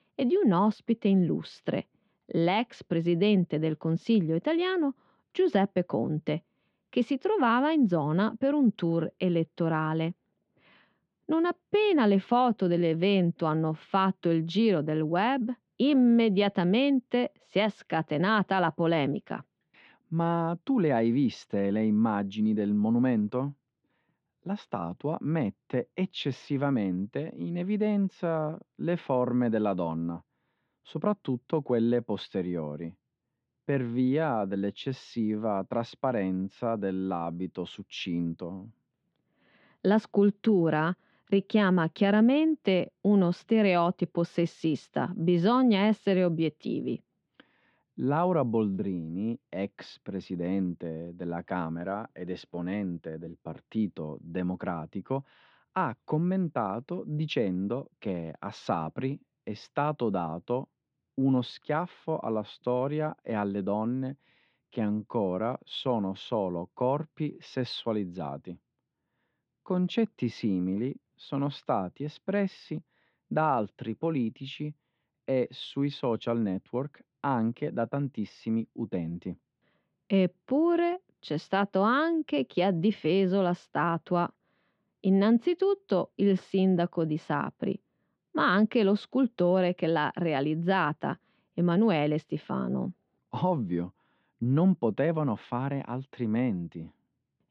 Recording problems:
muffled; slightly; fading above 3.5 kHz

